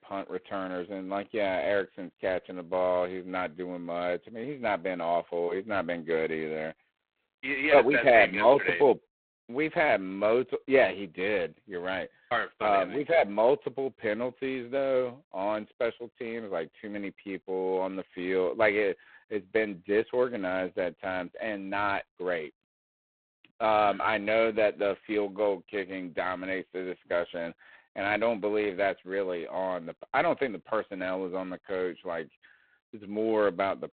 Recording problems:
phone-call audio; poor line; nothing above 4 kHz

